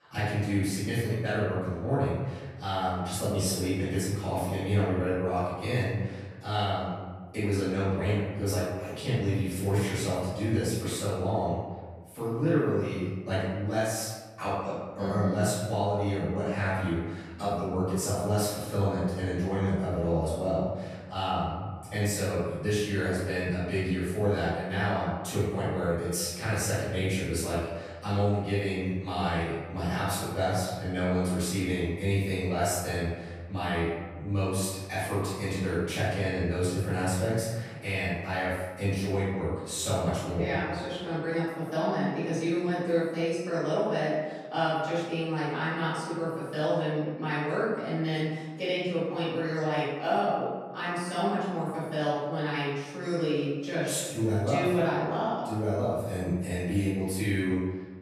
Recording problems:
room echo; strong; dies away in 1.2 s
off-mic speech; far

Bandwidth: 14 kHz